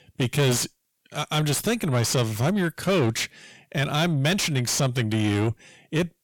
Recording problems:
distortion; heavy; 5 dB below the speech

